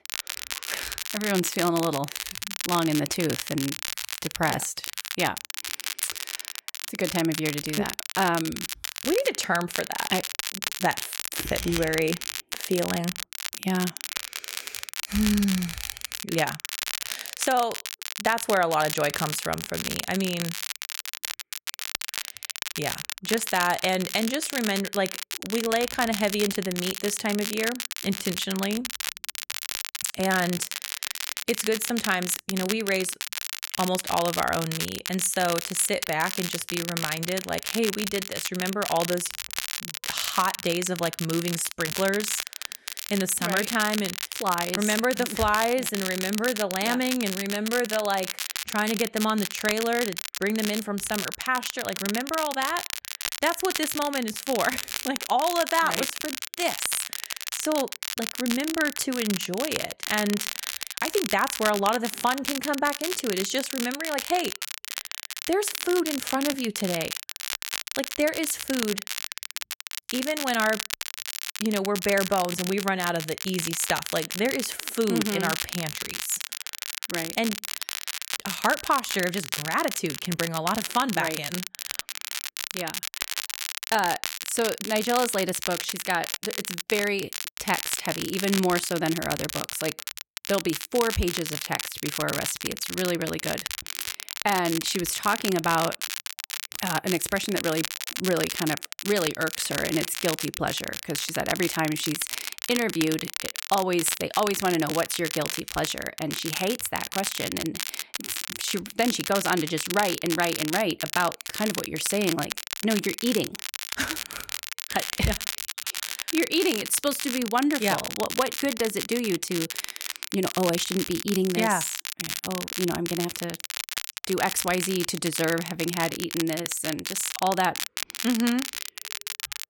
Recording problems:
crackle, like an old record; loud; 4 dB below the speech

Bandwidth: 17 kHz